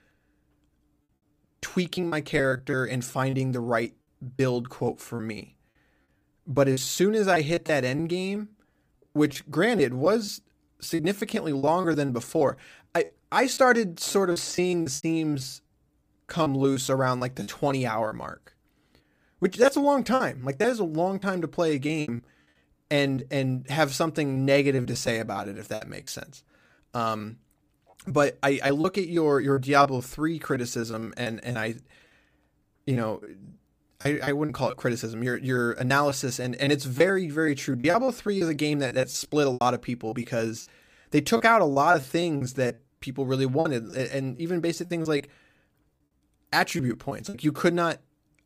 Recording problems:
choppy; very; 10% of the speech affected

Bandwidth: 15 kHz